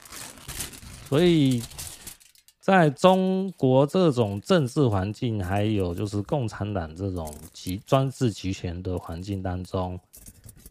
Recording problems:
household noises; noticeable; throughout; 15 dB below the speech

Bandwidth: 15 kHz